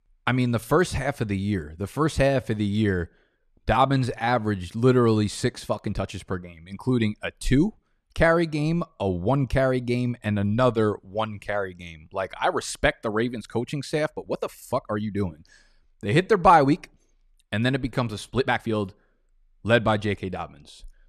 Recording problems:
uneven, jittery; strongly; from 2 to 20 s

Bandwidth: 13.5 kHz